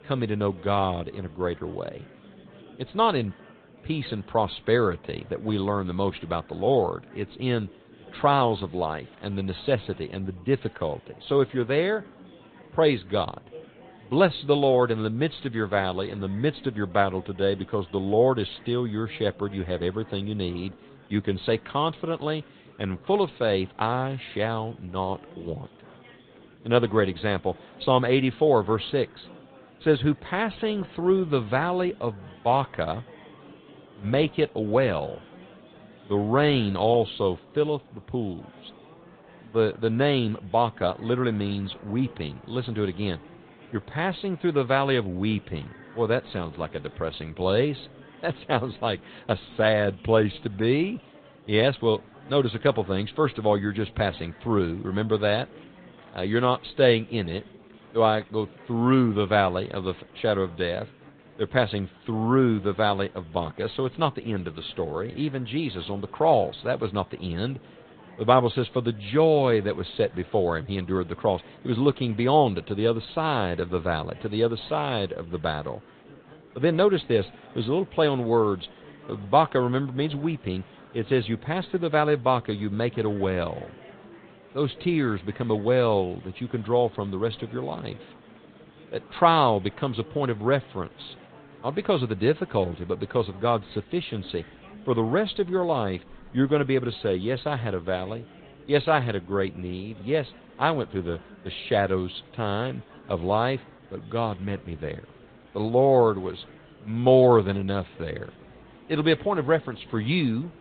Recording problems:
high frequencies cut off; severe; nothing above 4 kHz
garbled, watery; slightly
murmuring crowd; faint; throughout; 25 dB below the speech

